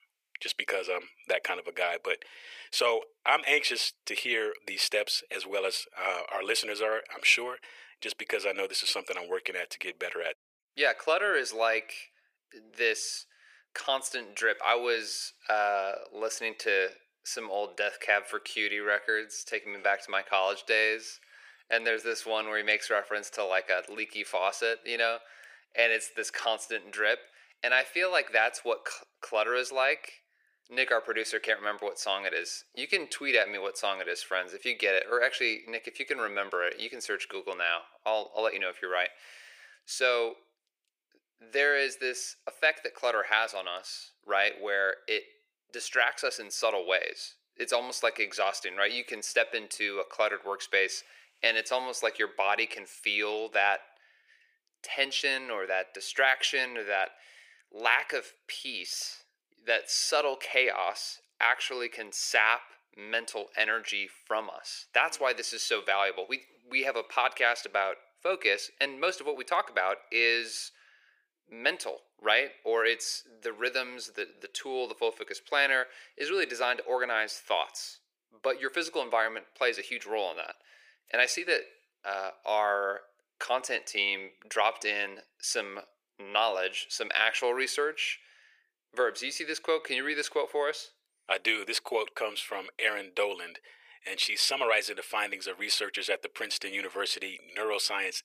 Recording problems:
thin; very; fading below 450 Hz

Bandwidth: 15 kHz